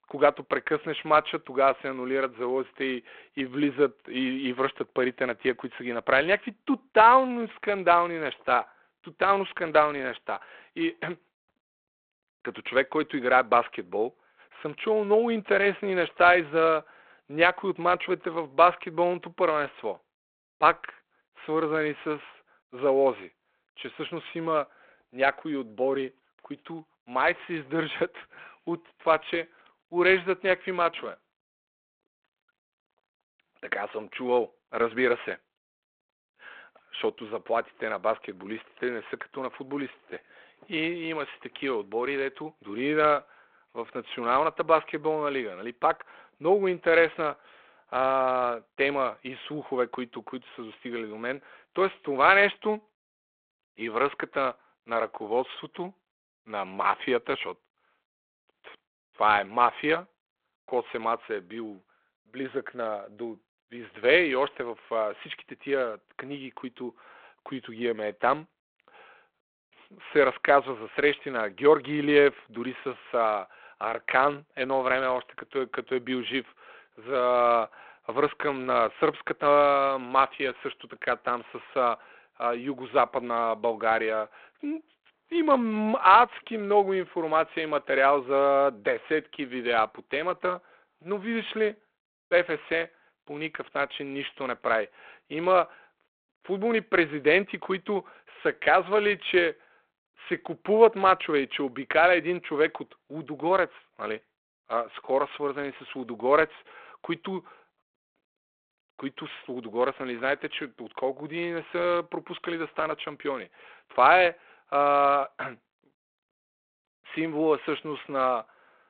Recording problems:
phone-call audio; nothing above 3.5 kHz

